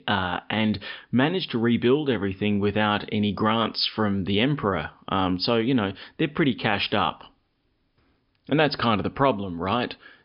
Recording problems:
high frequencies cut off; noticeable; nothing above 5.5 kHz

